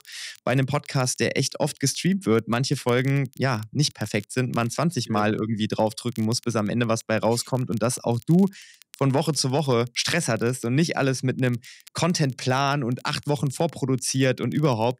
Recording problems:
crackle, like an old record; faint; 25 dB below the speech

